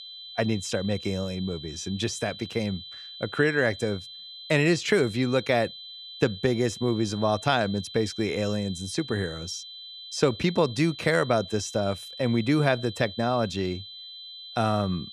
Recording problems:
high-pitched whine; noticeable; throughout; 4 kHz, 15 dB below the speech

